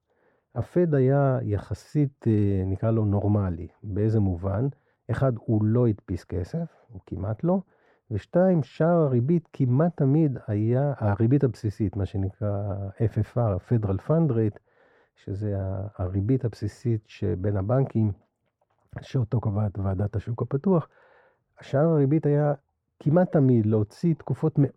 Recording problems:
muffled; very; fading above 2 kHz

